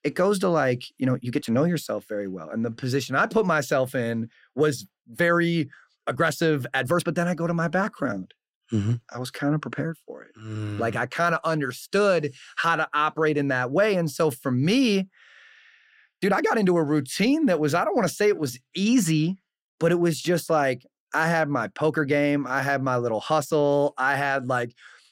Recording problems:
uneven, jittery; strongly; from 1 to 25 s

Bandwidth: 16 kHz